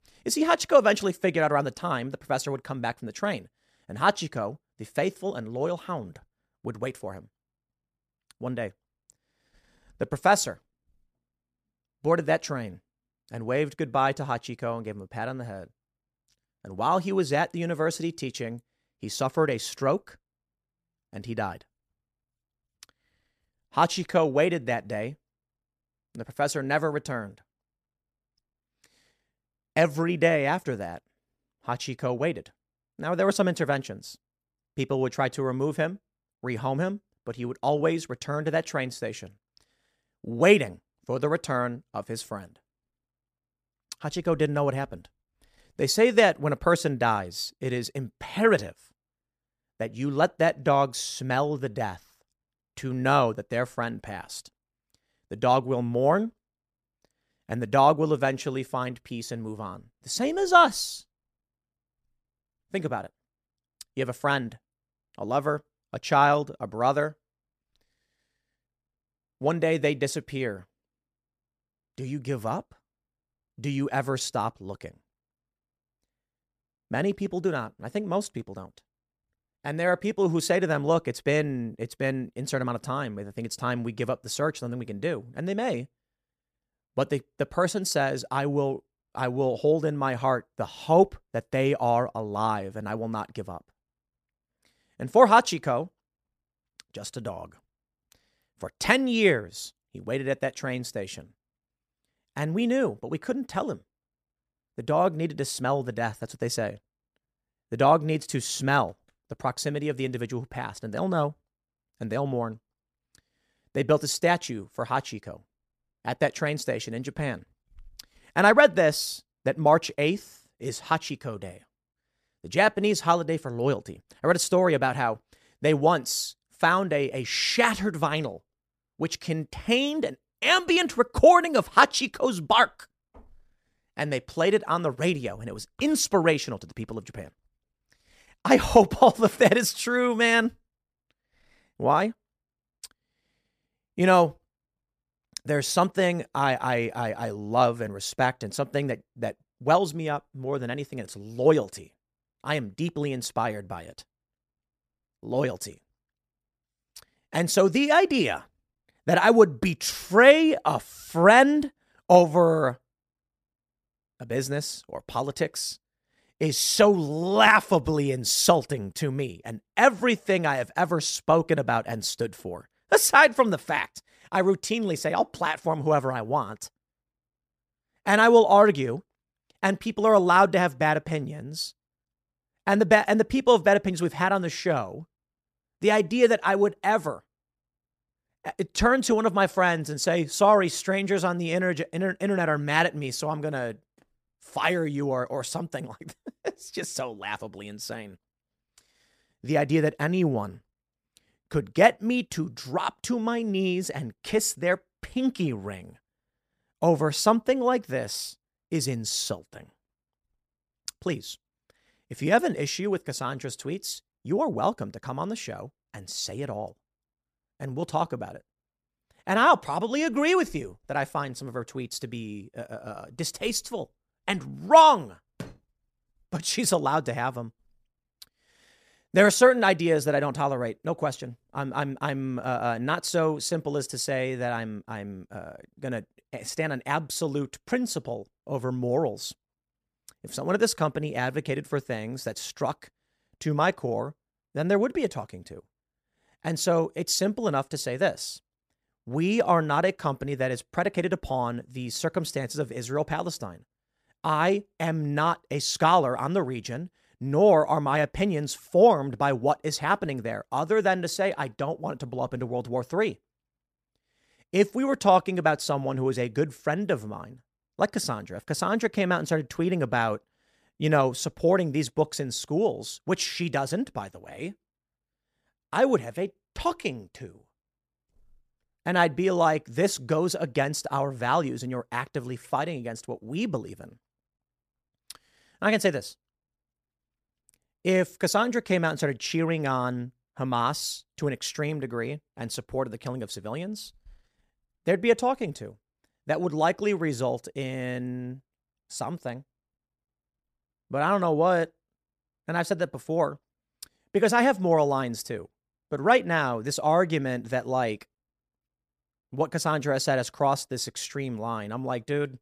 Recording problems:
none

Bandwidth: 14.5 kHz